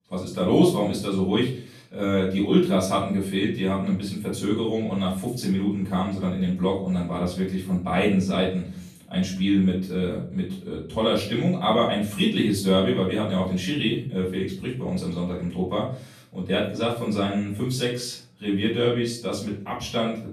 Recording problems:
off-mic speech; far
room echo; noticeable; dies away in 0.4 s

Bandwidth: 14 kHz